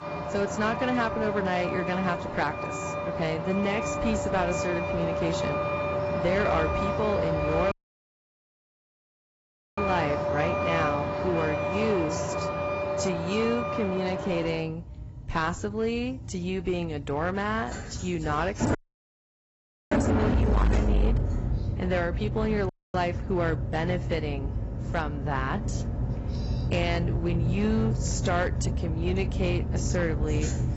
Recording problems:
garbled, watery; badly; nothing above 8 kHz
distortion; slight; 5% of the sound clipped
traffic noise; very loud; throughout; as loud as the speech
audio cutting out; at 7.5 s for 2 s, at 19 s for 1 s and at 23 s

